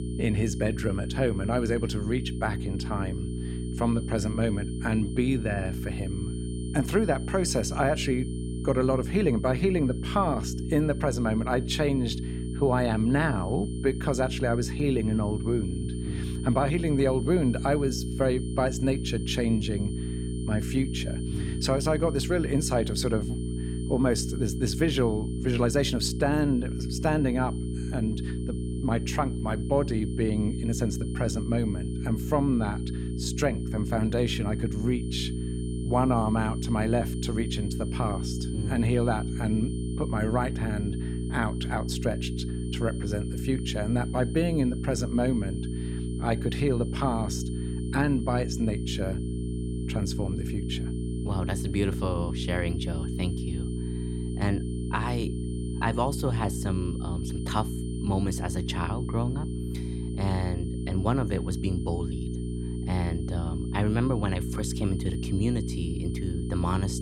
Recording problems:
electrical hum; loud; throughout; 60 Hz, 9 dB below the speech
high-pitched whine; faint; throughout; 9 kHz, 20 dB below the speech

